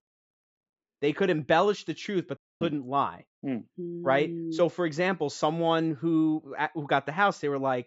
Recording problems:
high frequencies cut off; noticeable; nothing above 7.5 kHz
audio cutting out; at 2.5 s

